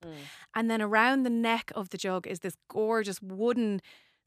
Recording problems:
none

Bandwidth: 14.5 kHz